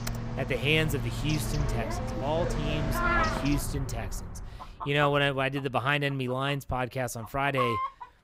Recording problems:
animal sounds; loud; throughout; 3 dB below the speech
keyboard typing; faint; at the start; peak 10 dB below the speech

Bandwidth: 15.5 kHz